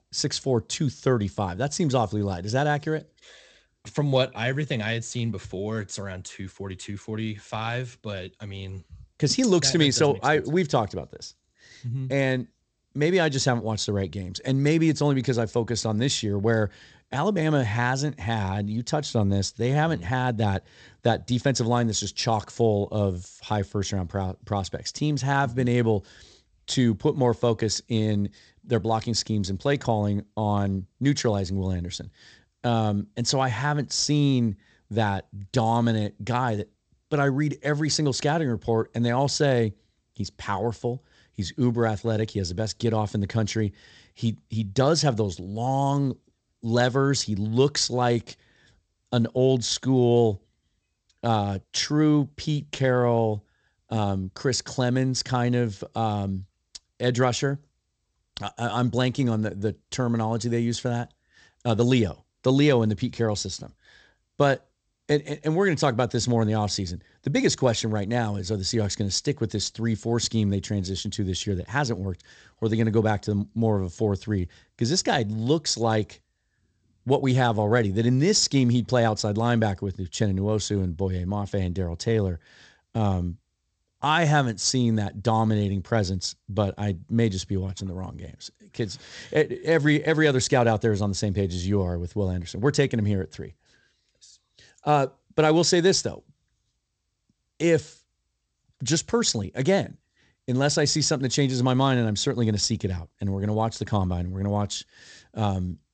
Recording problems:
garbled, watery; slightly; nothing above 8 kHz

